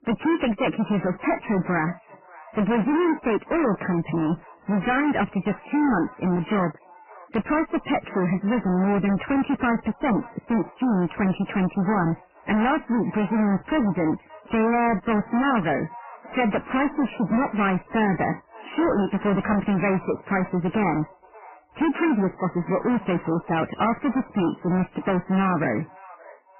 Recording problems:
distortion; heavy; 26% of the sound clipped
garbled, watery; badly; nothing above 3 kHz
echo of what is said; faint; throughout; 580 ms later, 25 dB below the speech

